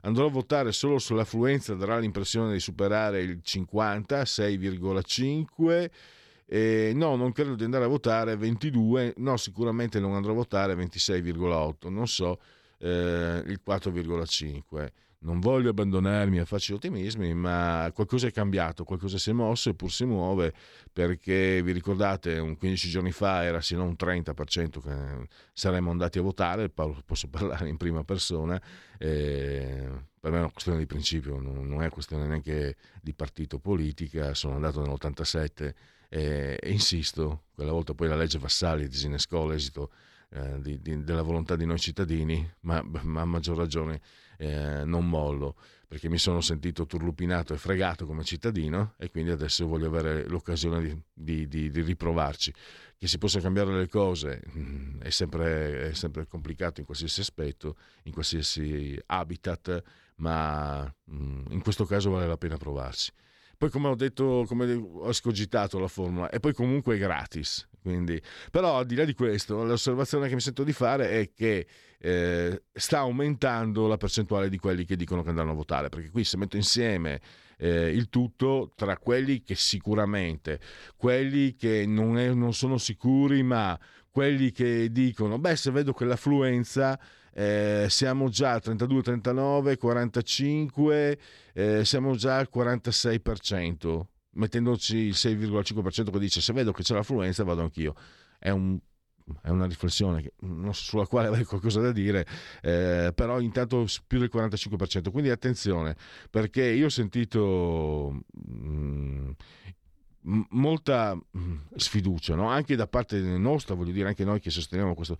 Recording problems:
none

